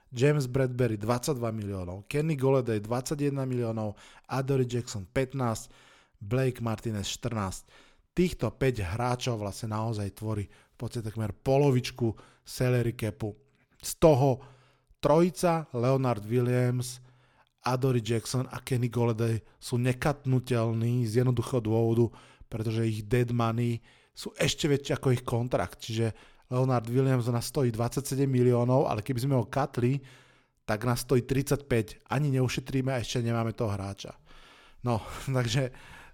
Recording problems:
none

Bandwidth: 18 kHz